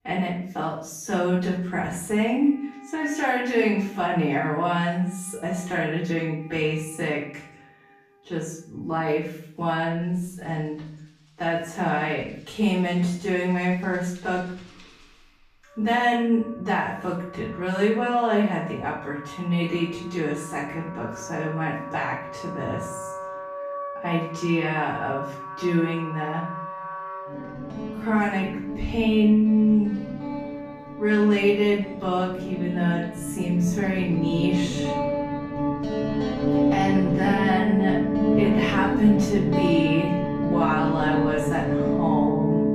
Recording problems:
off-mic speech; far
wrong speed, natural pitch; too slow; 0.6 times normal speed
room echo; noticeable; dies away in 0.6 s
background music; loud; throughout; 2 dB below the speech

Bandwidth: 14.5 kHz